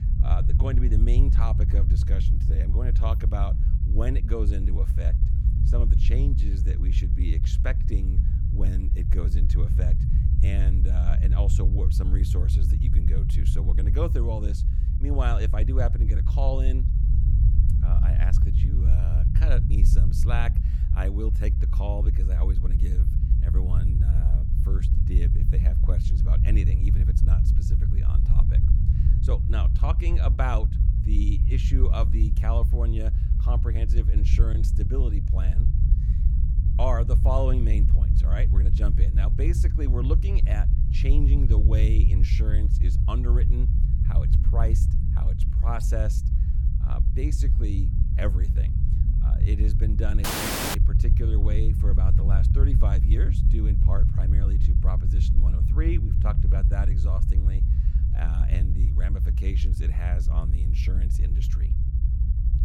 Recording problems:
low rumble; loud; throughout; 3 dB below the speech
audio cutting out; at 50 s for 0.5 s

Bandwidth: 17.5 kHz